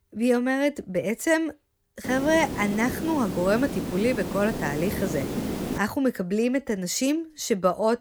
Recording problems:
hiss; loud; from 2 to 6 s; 6 dB below the speech

